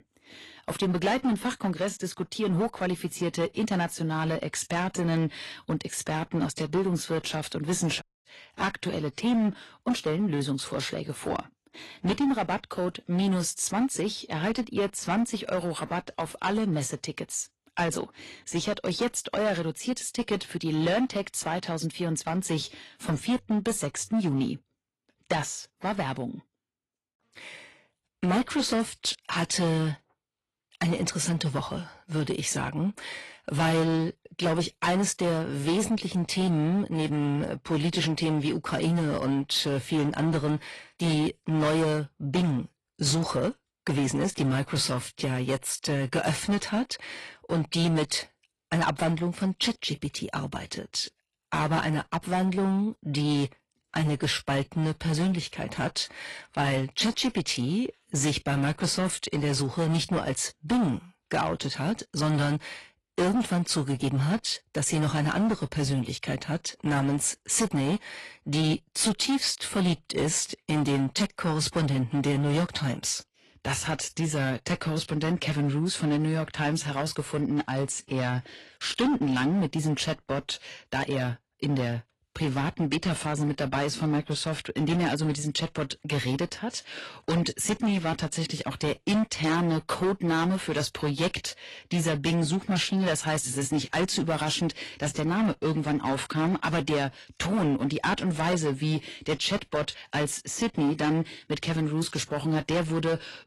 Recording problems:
distortion; slight; 11% of the sound clipped
garbled, watery; slightly; nothing above 11 kHz
audio cutting out; at 8 s

